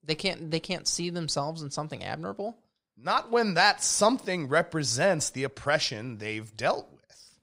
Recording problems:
none

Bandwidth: 15.5 kHz